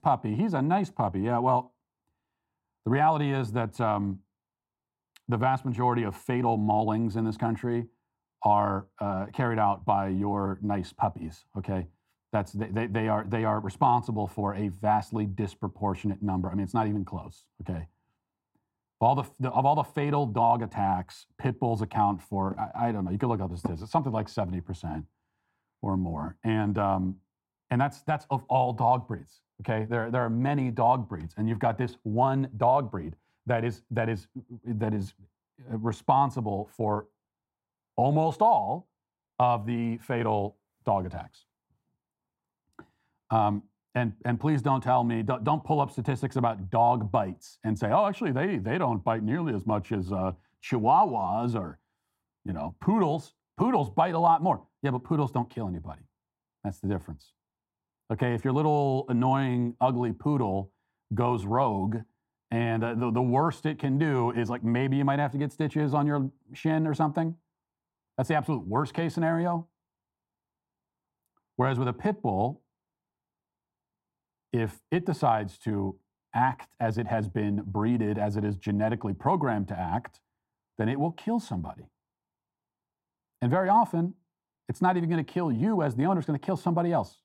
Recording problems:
muffled; very; fading above 1.5 kHz

